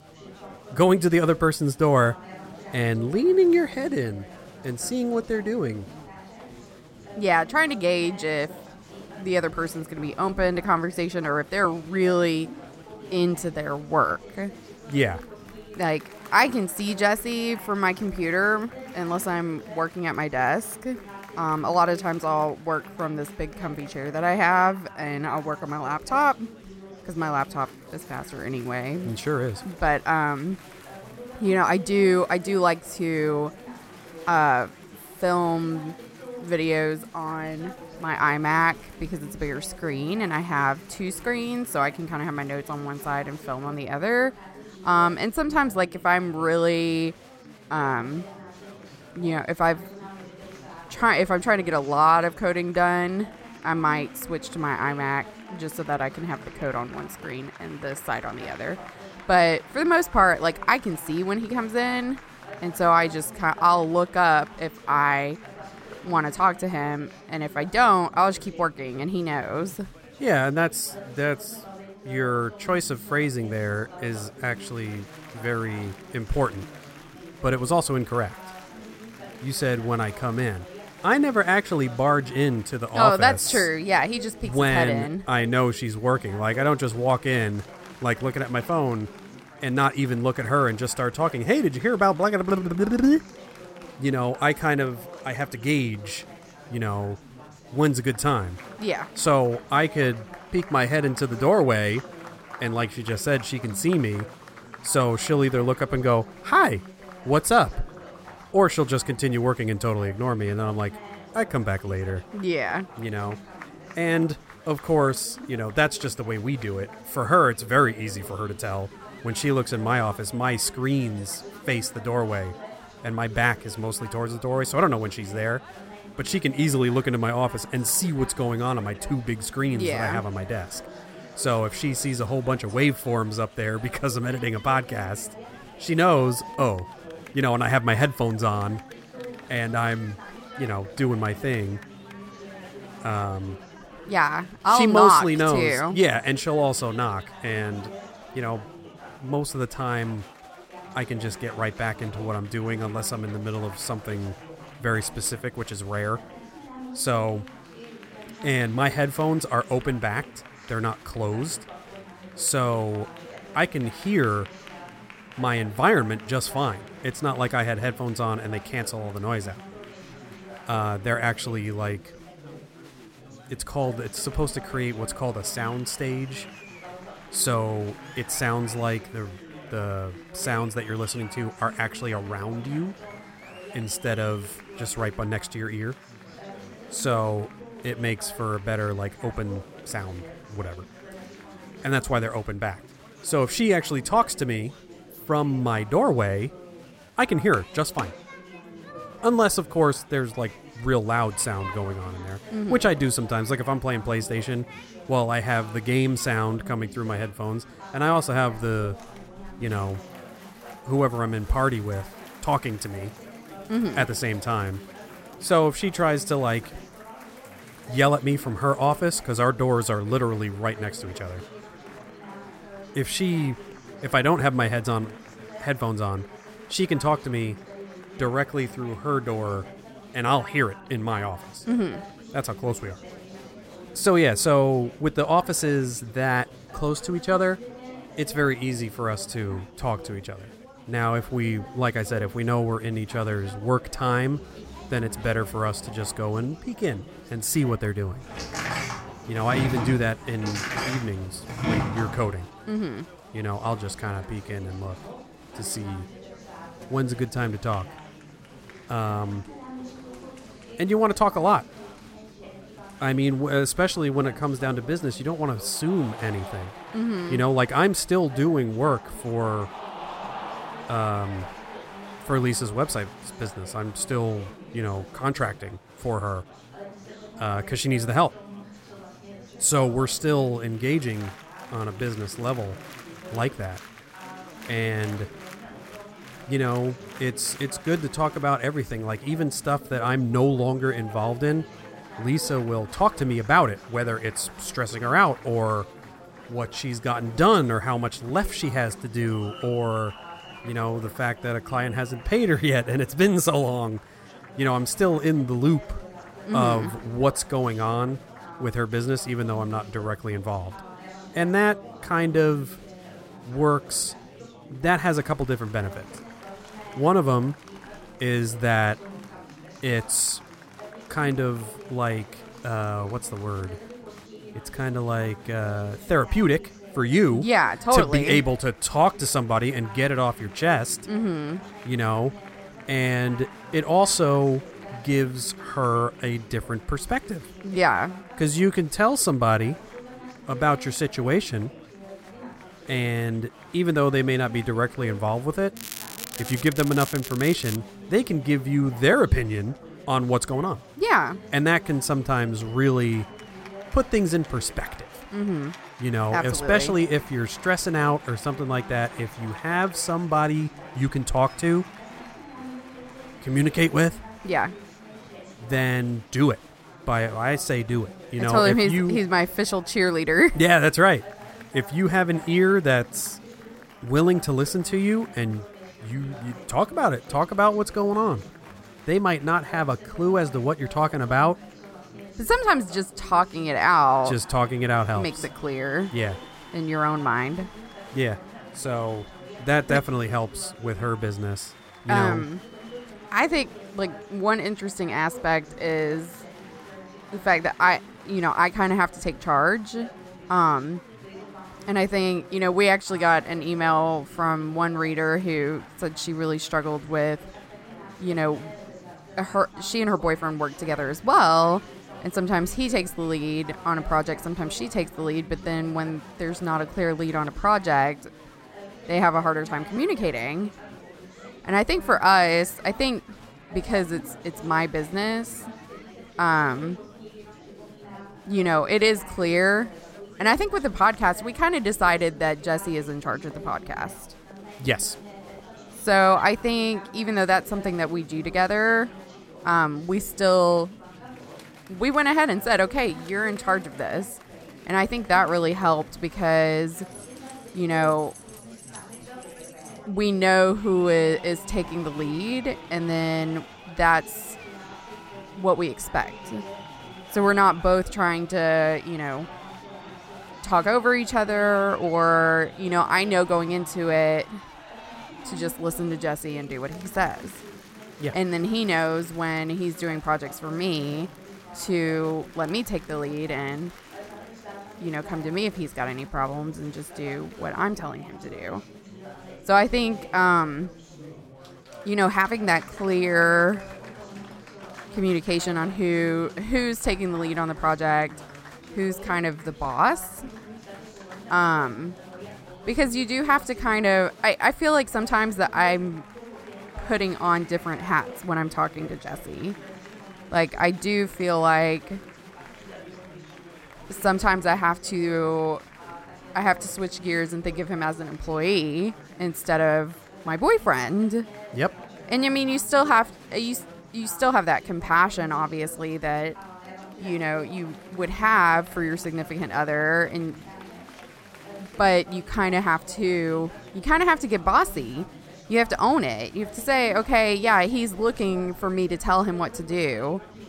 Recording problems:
chatter from many people; noticeable; throughout; 20 dB below the speech
crackling; noticeable; from 5:46 to 5:48; 10 dB below the speech
door banging; noticeable; from 4:08 to 4:12; peak 2 dB below the speech
jangling keys; faint; from 7:27 to 7:30; peak 20 dB below the speech

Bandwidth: 16 kHz